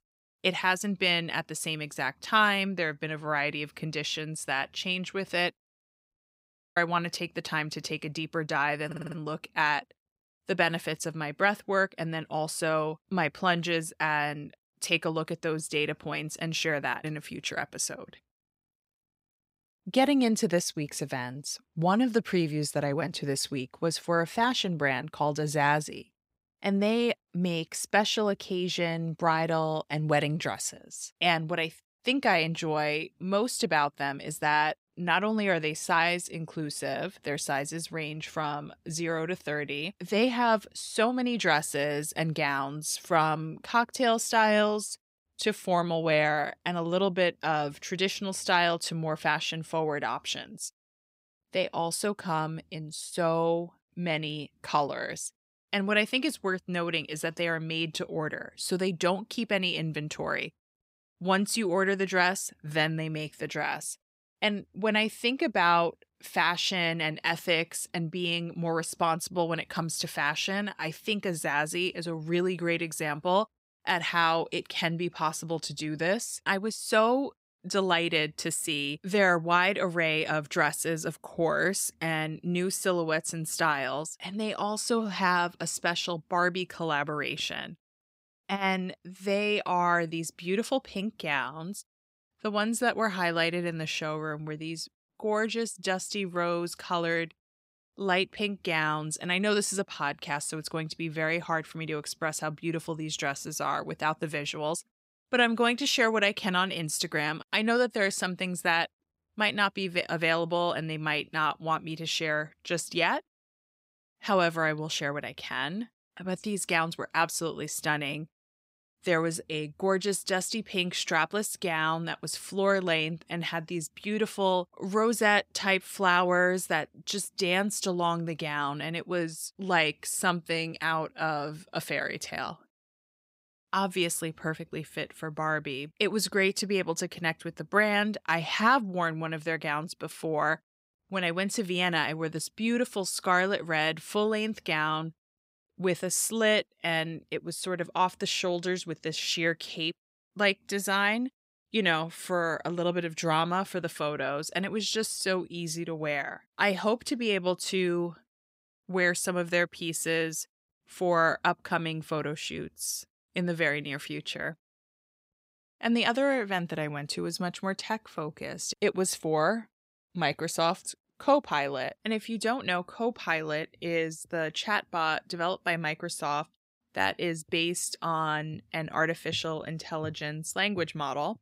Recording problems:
audio stuttering; at 9 s

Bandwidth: 15.5 kHz